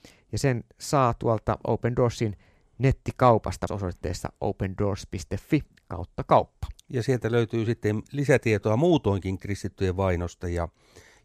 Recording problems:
none

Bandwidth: 14.5 kHz